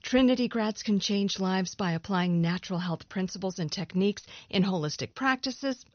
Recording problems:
high frequencies cut off; noticeable; nothing above 6 kHz

